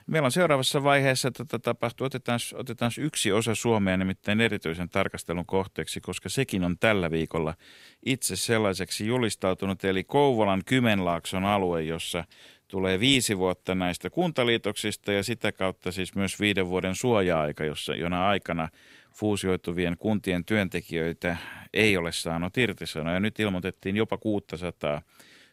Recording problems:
none

